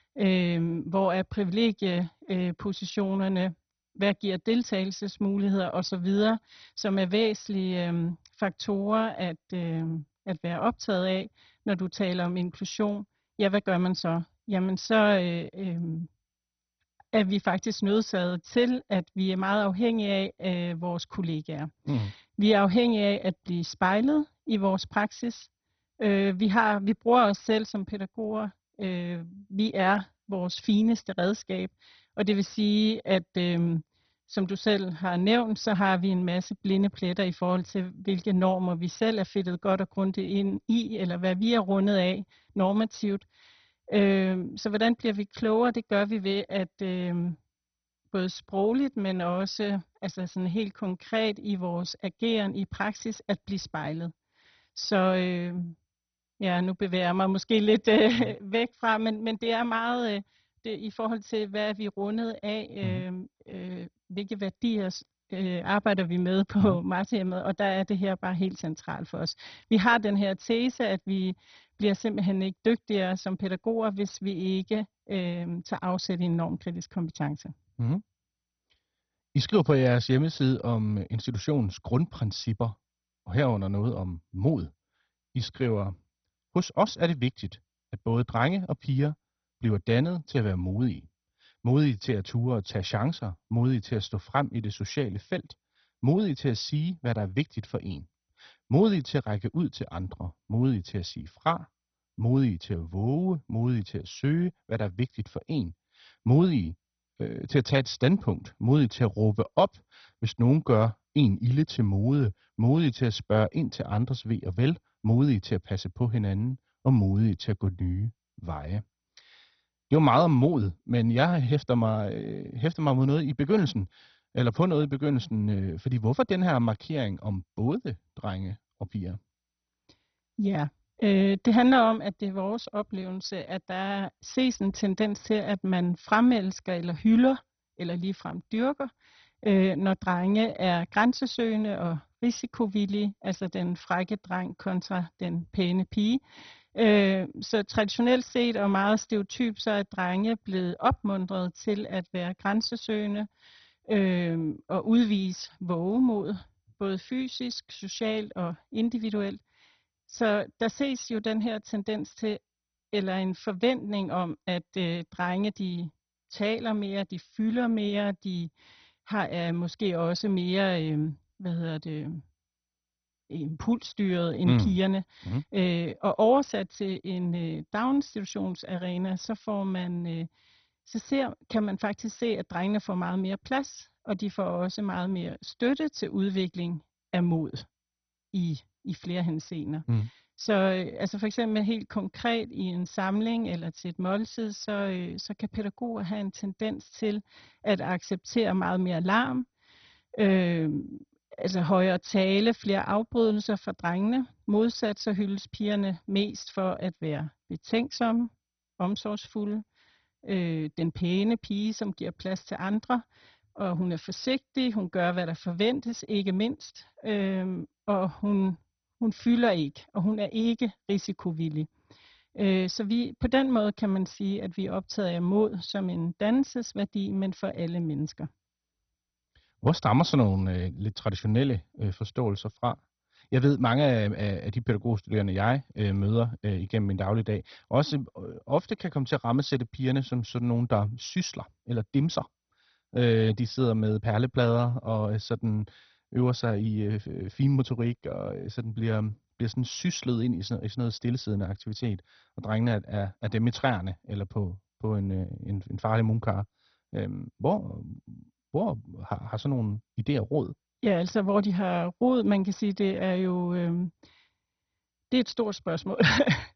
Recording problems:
garbled, watery; badly; nothing above 6 kHz

